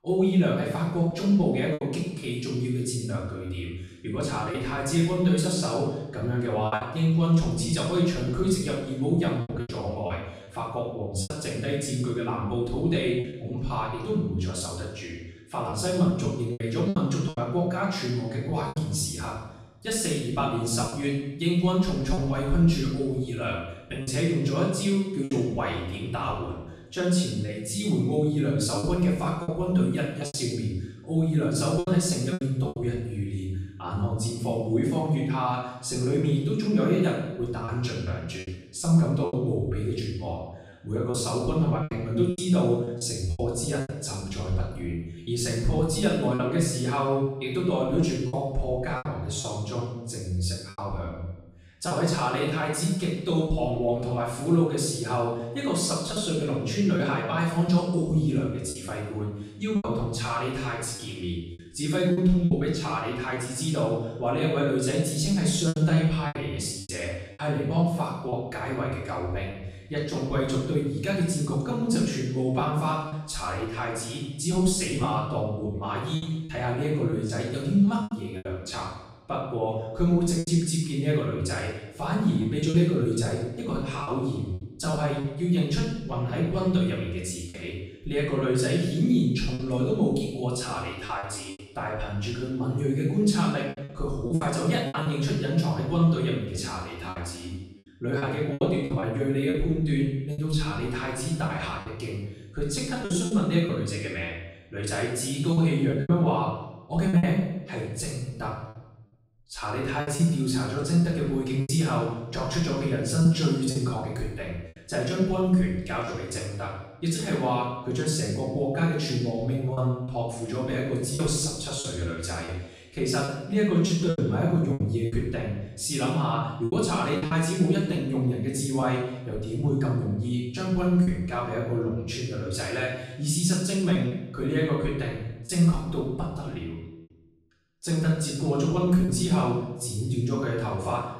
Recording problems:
off-mic speech; far
room echo; noticeable; dies away in 0.8 s
choppy; occasionally; 5% of the speech affected

